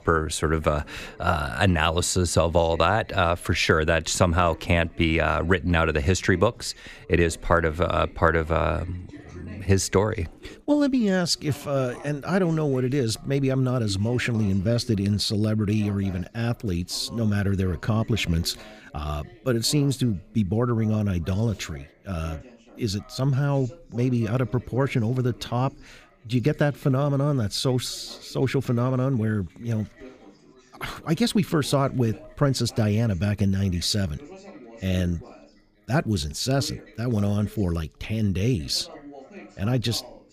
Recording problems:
background chatter; faint; throughout; 3 voices, 25 dB below the speech

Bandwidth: 15 kHz